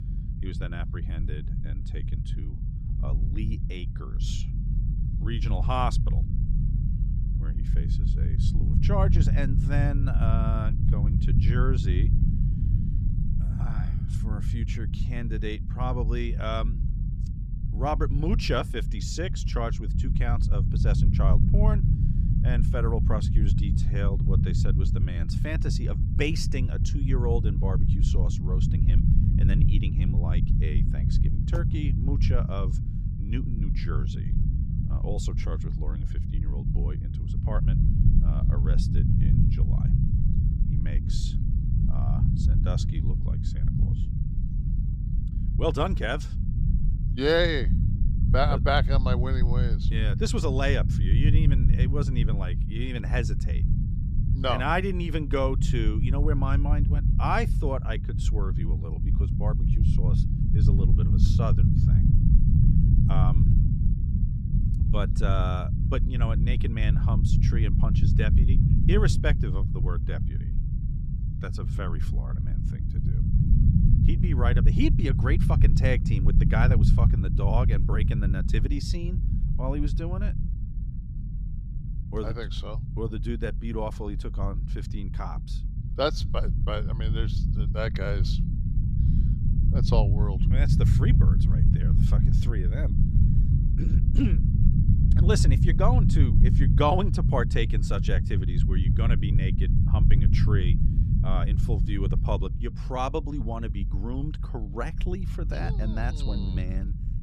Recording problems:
low rumble; loud; throughout; 6 dB below the speech

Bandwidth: 15.5 kHz